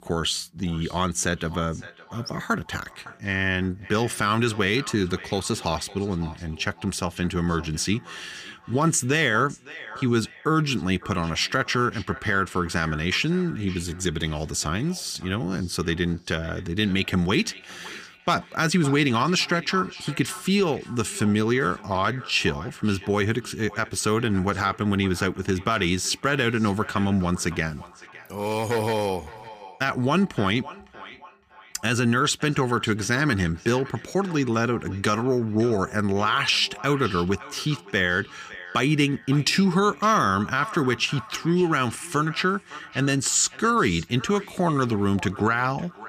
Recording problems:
echo of what is said; faint; throughout; 560 ms later, 20 dB below the speech

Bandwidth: 15 kHz